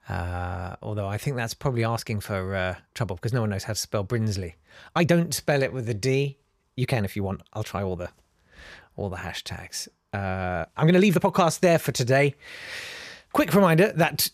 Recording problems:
uneven, jittery; strongly; from 2 to 11 s

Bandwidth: 14.5 kHz